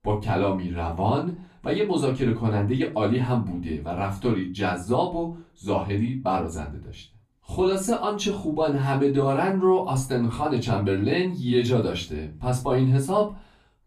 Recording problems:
off-mic speech; far
room echo; very slight; dies away in 0.2 s

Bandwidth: 14.5 kHz